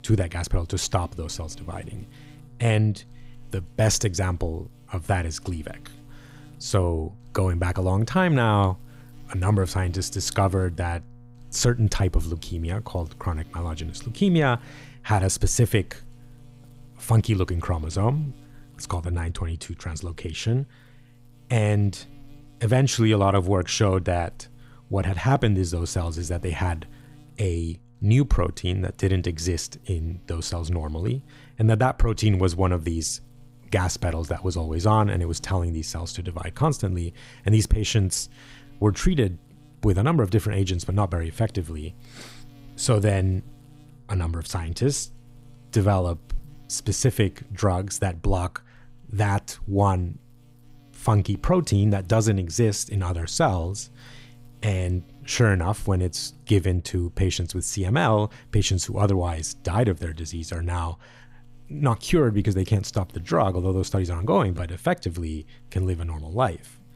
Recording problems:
electrical hum; faint; throughout; 60 Hz, 30 dB below the speech

